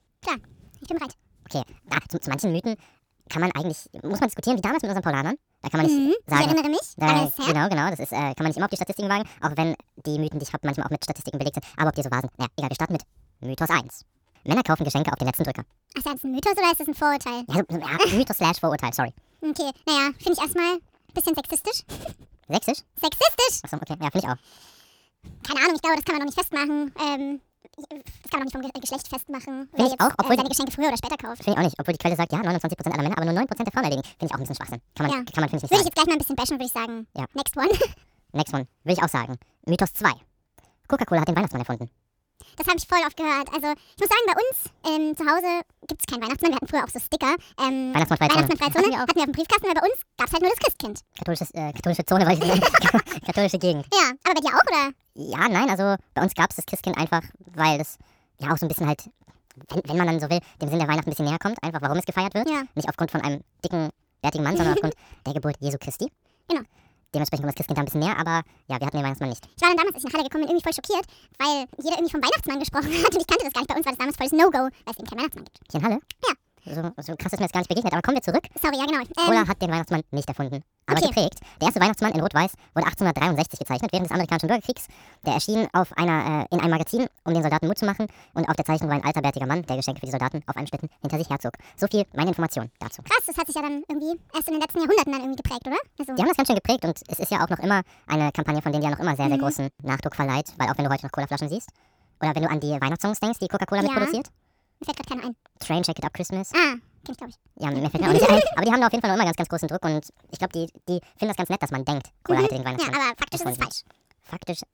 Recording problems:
wrong speed and pitch; too fast and too high; 1.6 times normal speed

